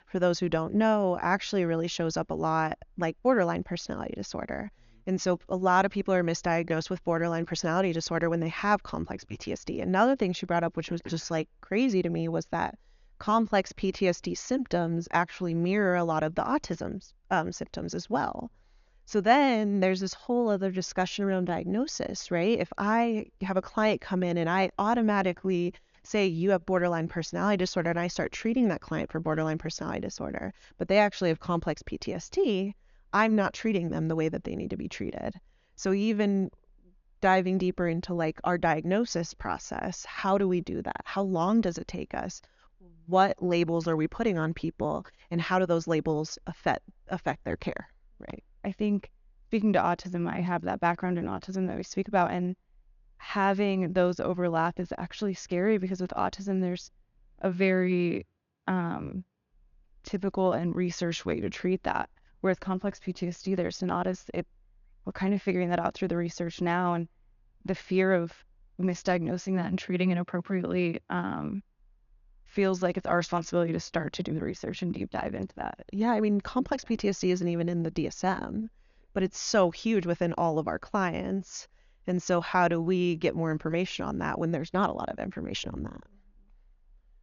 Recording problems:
high frequencies cut off; noticeable; nothing above 7 kHz

